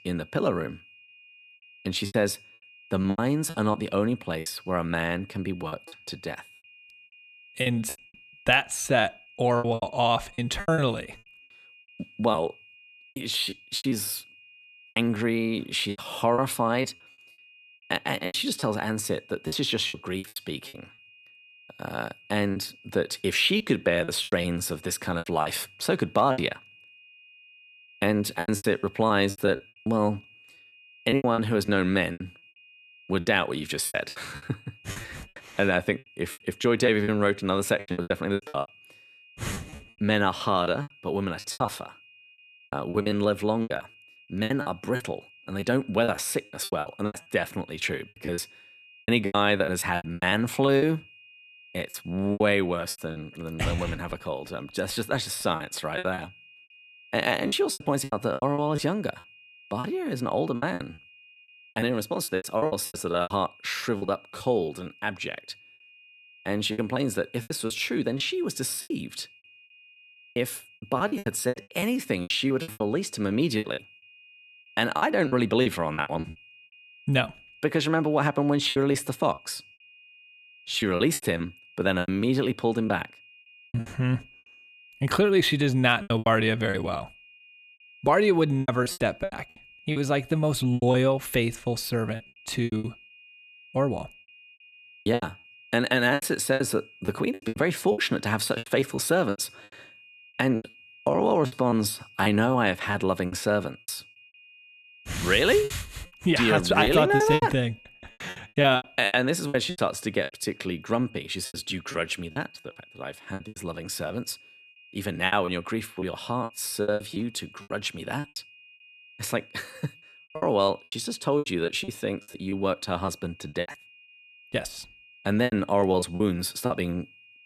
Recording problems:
high-pitched whine; faint; throughout; 2.5 kHz, 25 dB below the speech
choppy; very; 14% of the speech affected

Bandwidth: 14 kHz